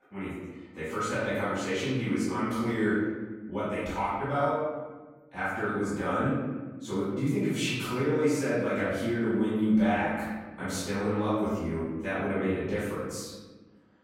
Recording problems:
room echo; strong; dies away in 1.3 s
off-mic speech; far

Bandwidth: 16 kHz